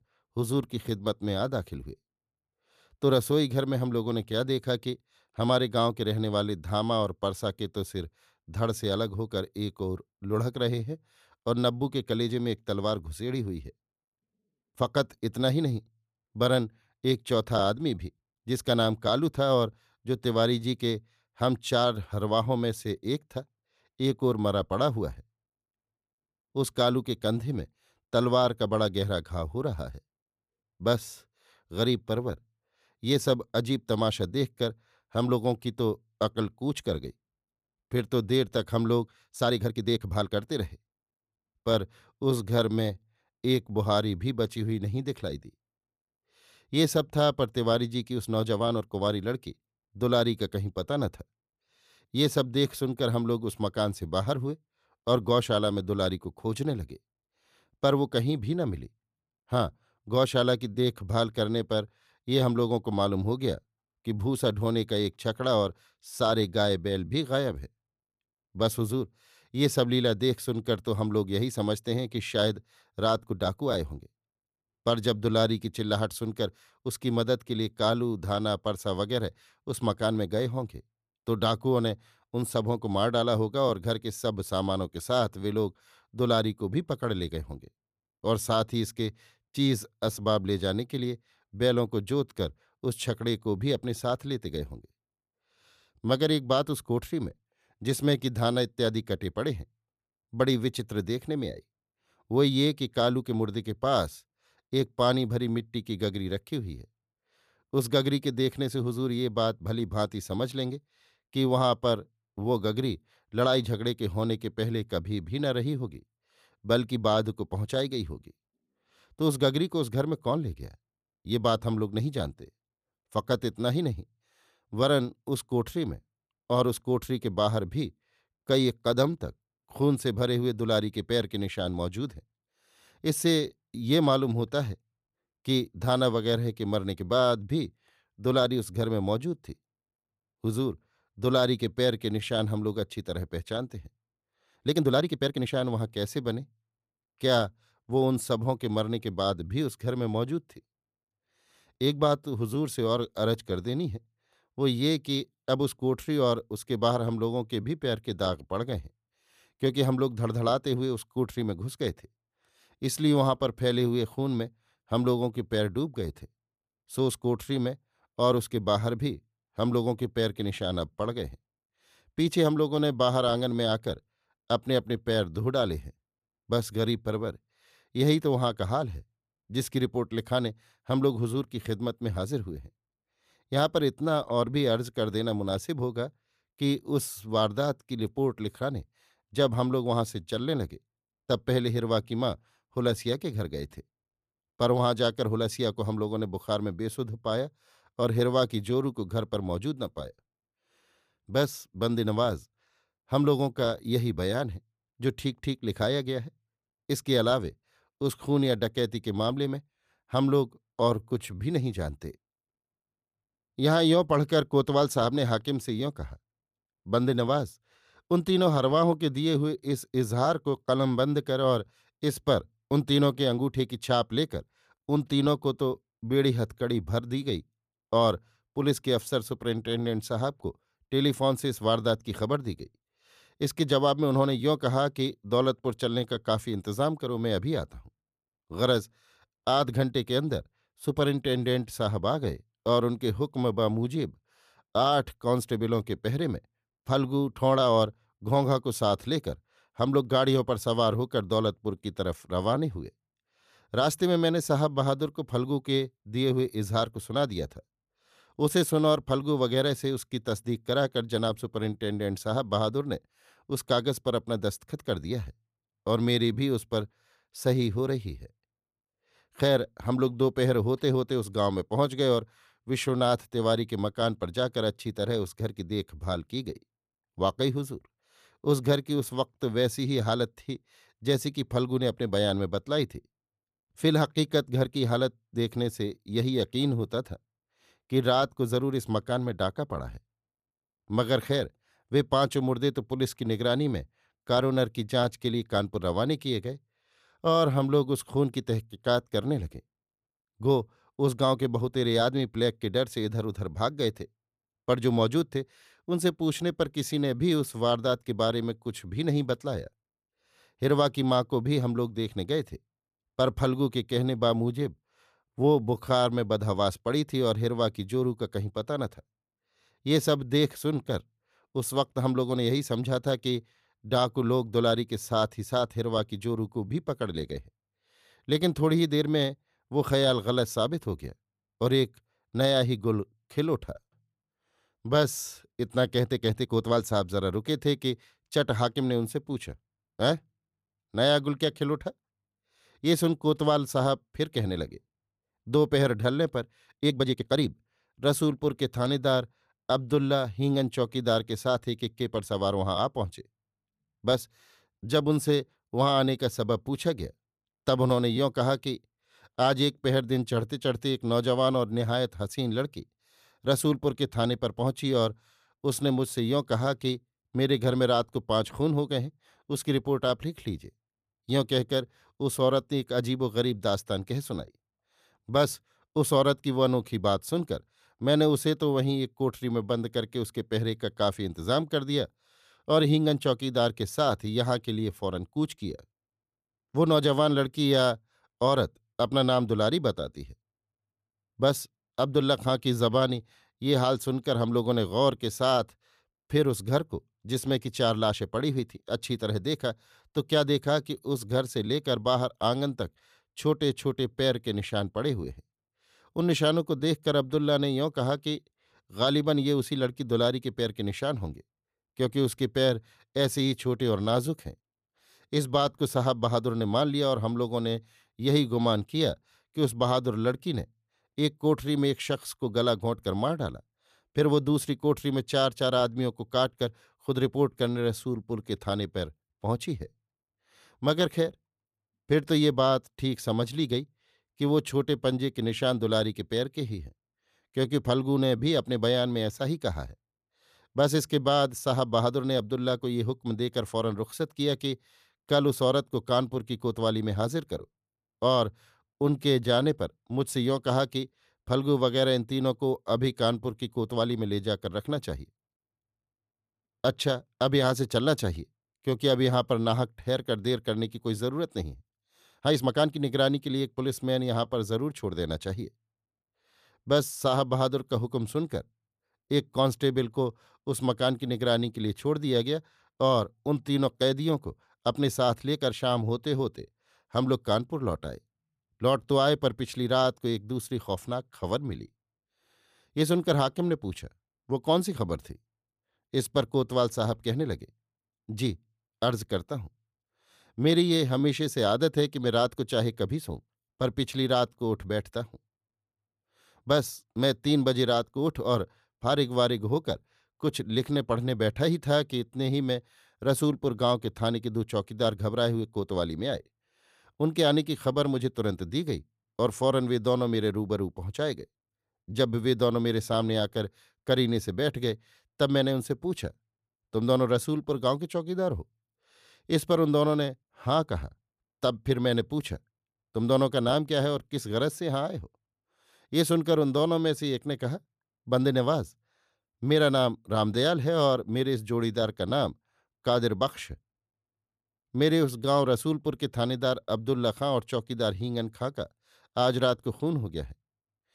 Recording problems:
uneven, jittery; strongly; from 39 s to 8:23

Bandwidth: 14.5 kHz